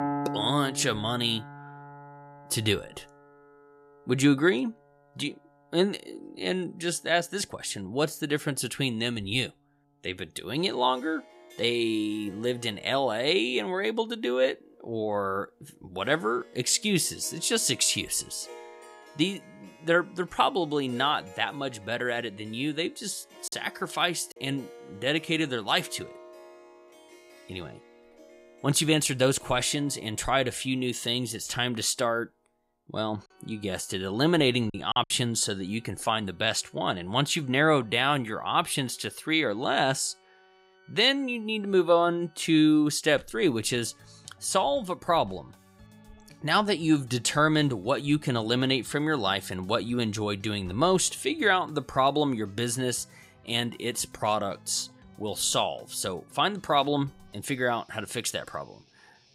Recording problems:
background music; faint; throughout; 20 dB below the speech
choppy; occasionally; at 23 s and at 35 s; 5% of the speech affected

